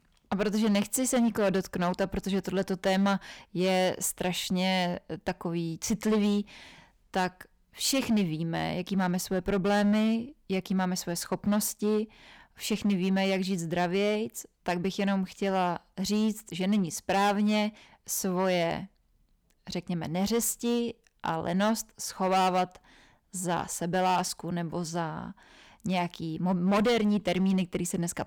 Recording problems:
distortion; slight; 7% of the sound clipped

